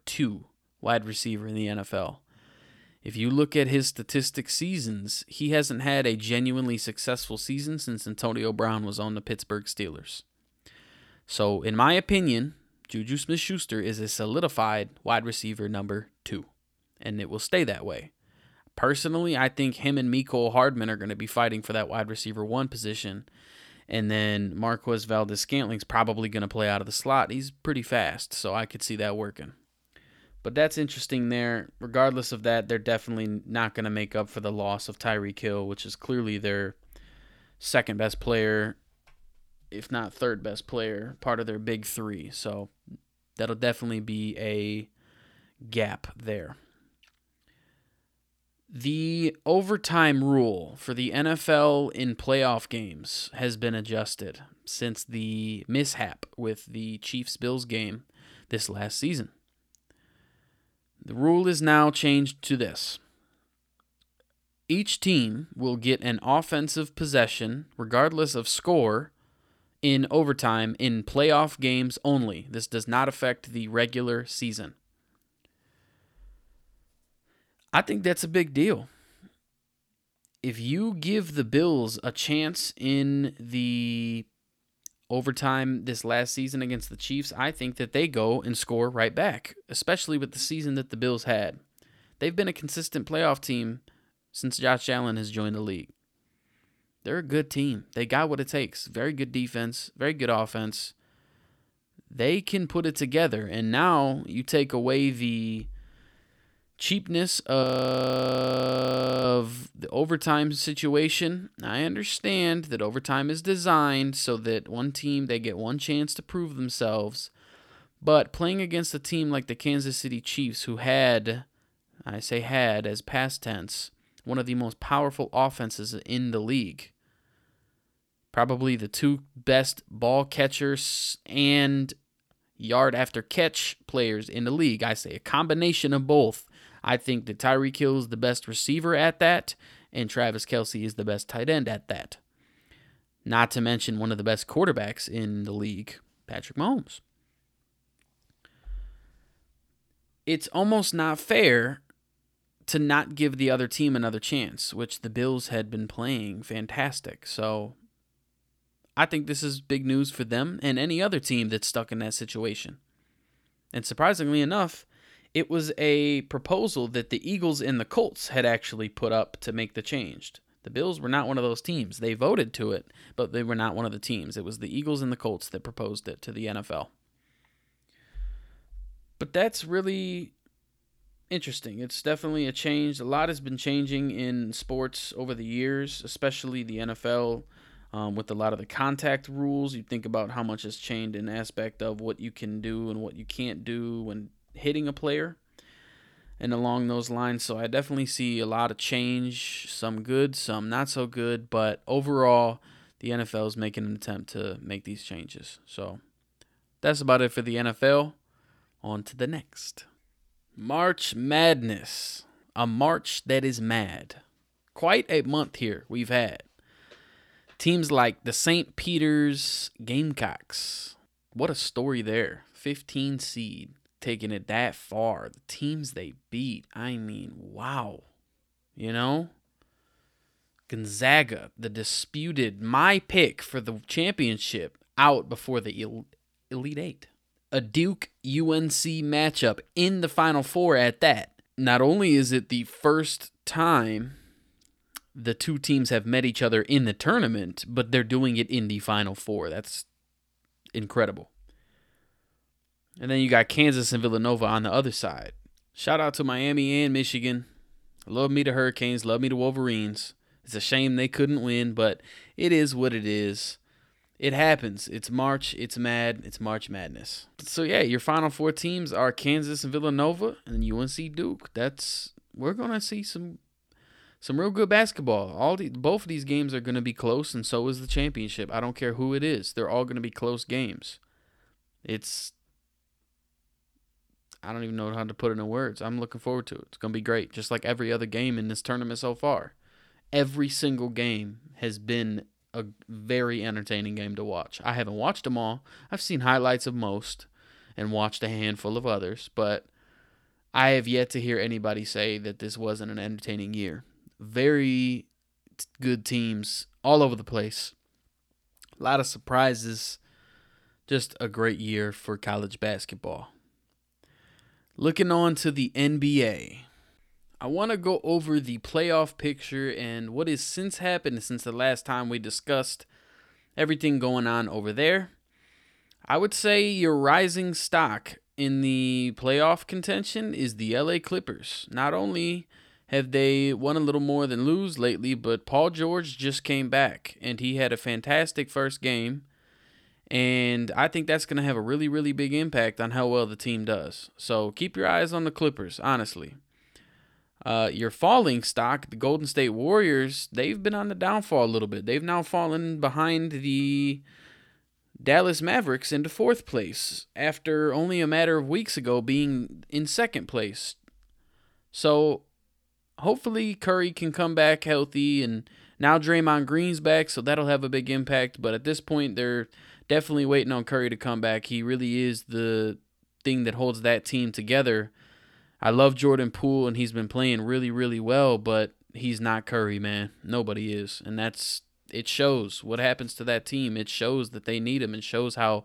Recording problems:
audio freezing; at 1:48 for 1.5 s

